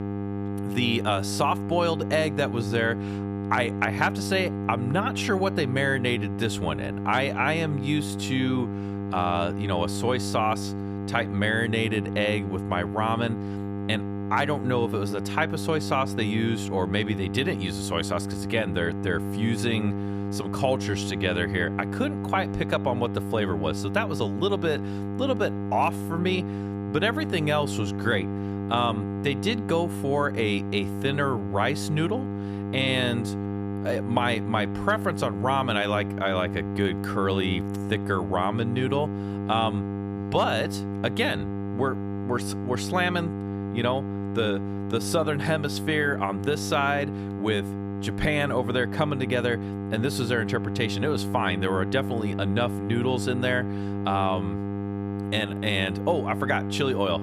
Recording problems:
electrical hum; loud; throughout; 50 Hz, 9 dB below the speech

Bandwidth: 14.5 kHz